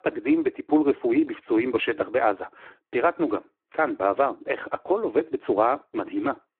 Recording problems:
phone-call audio; poor line

